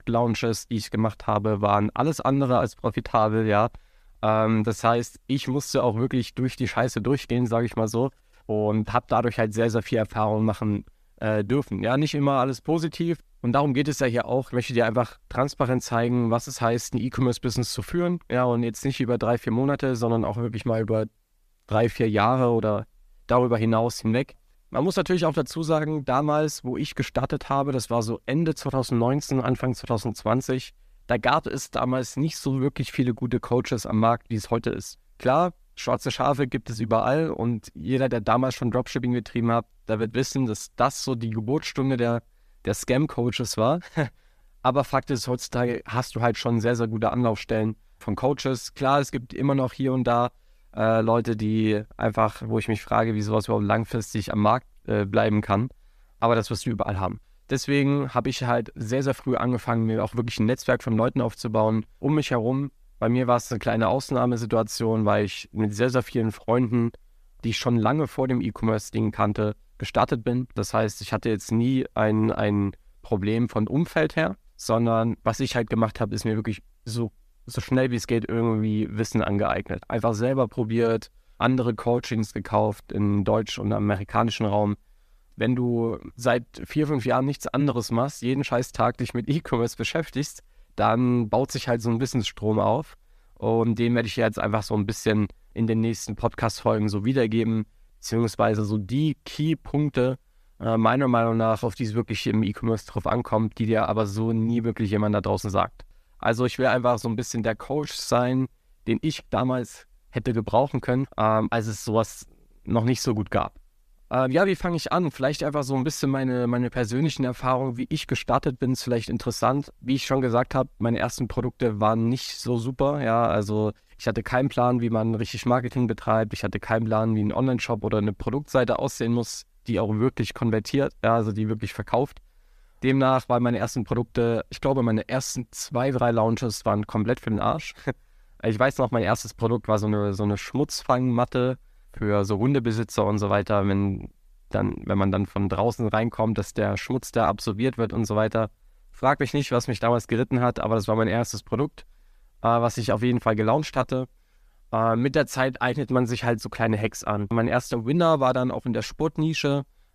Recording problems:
none

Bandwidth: 14.5 kHz